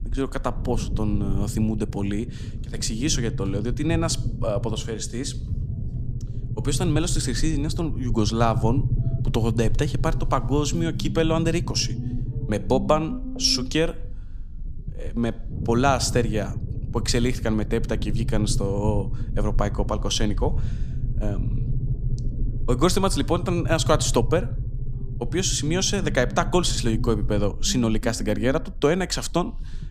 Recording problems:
low rumble; noticeable; throughout; 15 dB below the speech

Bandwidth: 15 kHz